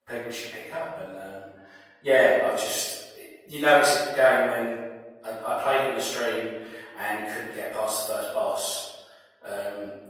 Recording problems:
room echo; strong; dies away in 1.1 s
off-mic speech; far
thin; very; fading below 550 Hz
garbled, watery; slightly; nothing above 18.5 kHz

